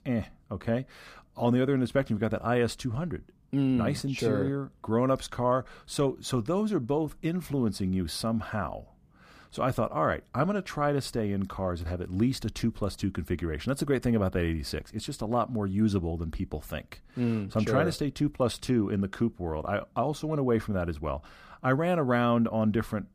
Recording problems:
none

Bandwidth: 15 kHz